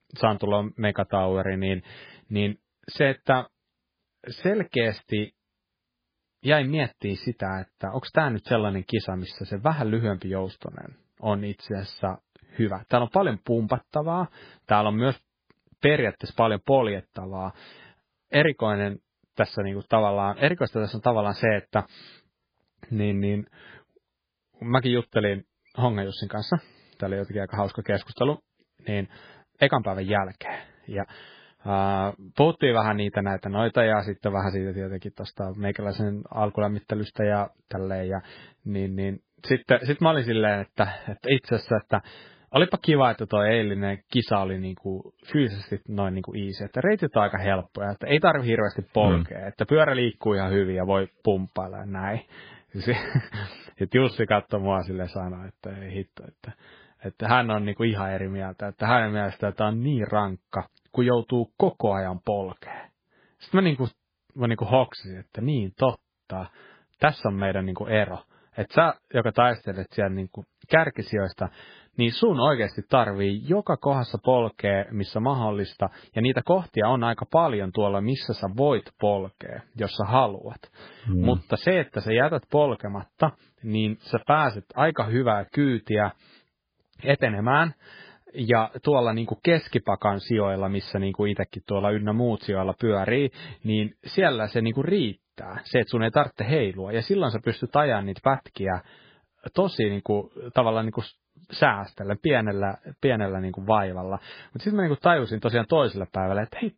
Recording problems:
garbled, watery; badly

